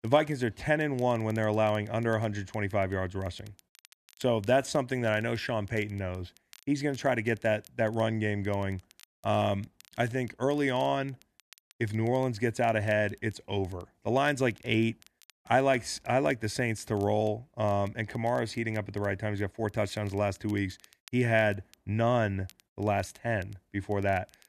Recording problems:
crackle, like an old record; faint; 30 dB below the speech

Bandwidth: 13.5 kHz